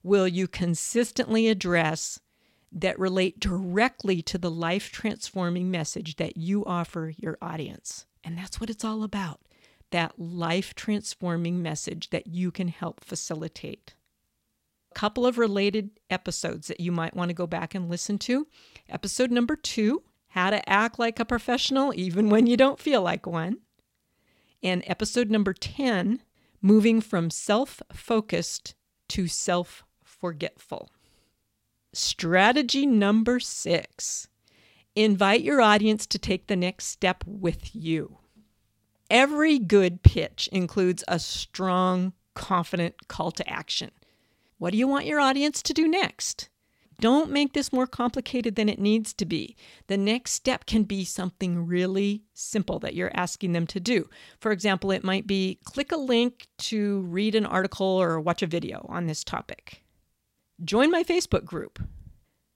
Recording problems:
none

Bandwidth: 16 kHz